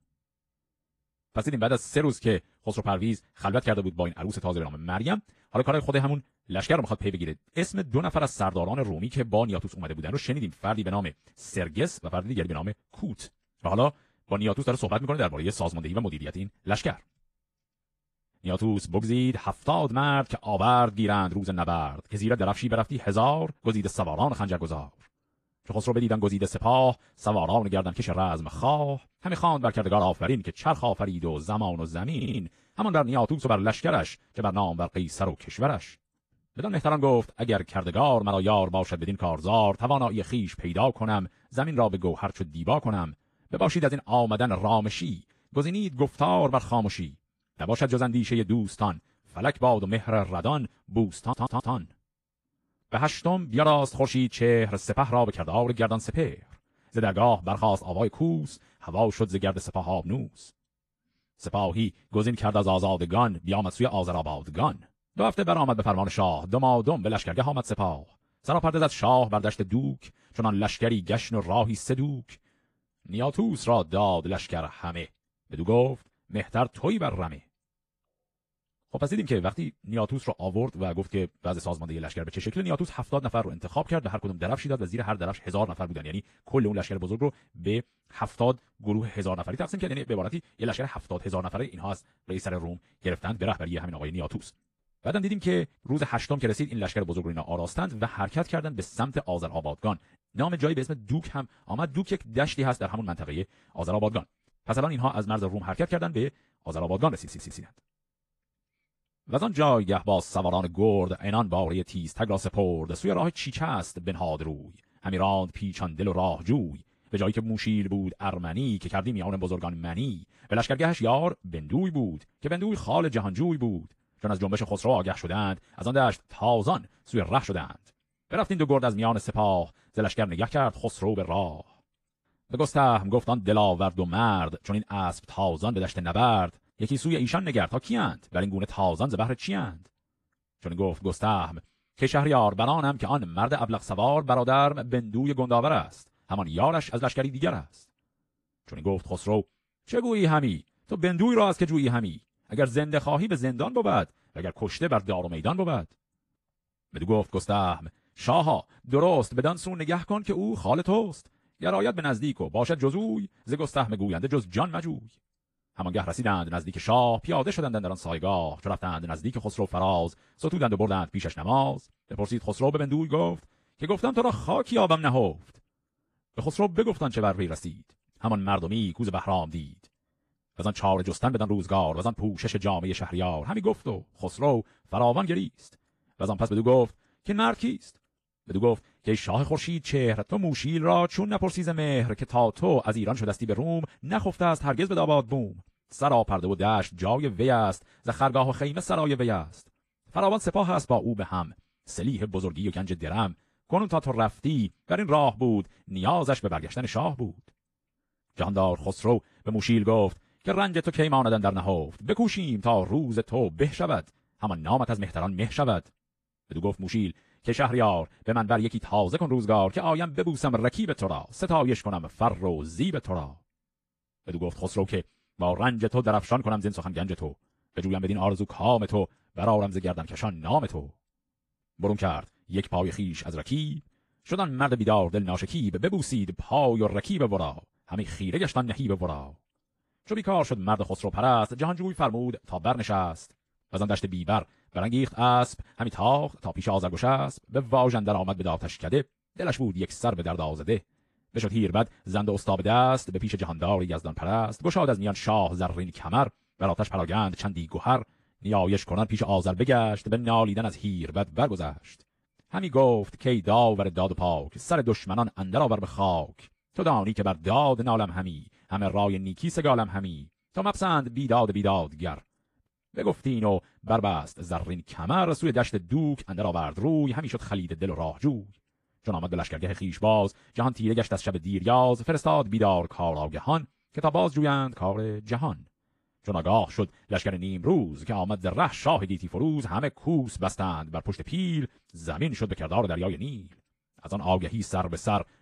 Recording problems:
wrong speed, natural pitch; too fast; 1.5 times normal speed
garbled, watery; slightly
audio stuttering; at 32 s, at 51 s and at 1:47

